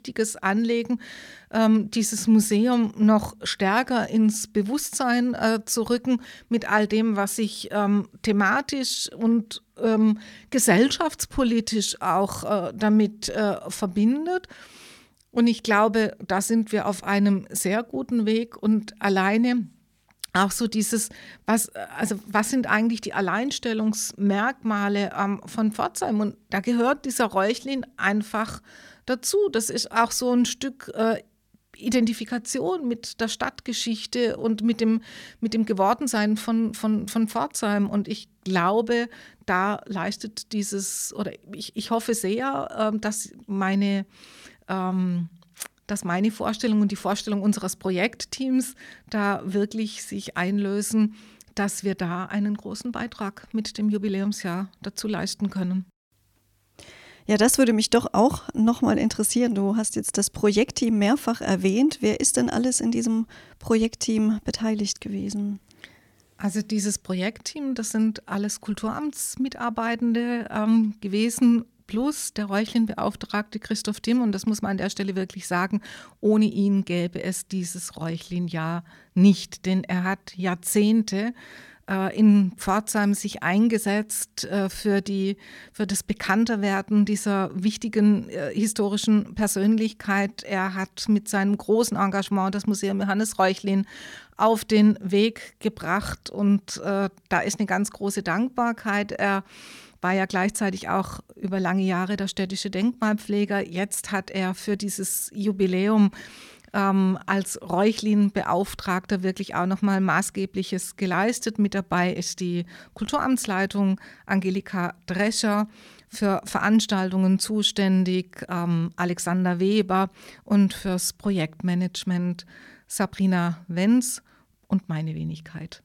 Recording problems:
none

